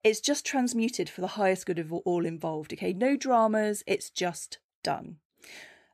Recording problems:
none

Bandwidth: 14.5 kHz